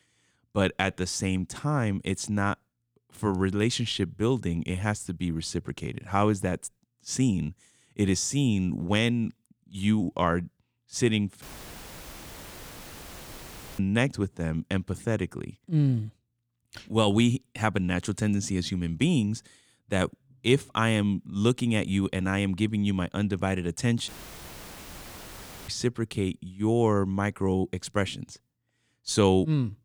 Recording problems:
audio cutting out; filled with static; at 11 s for 2.5 s and at 24 s for 1.5 s

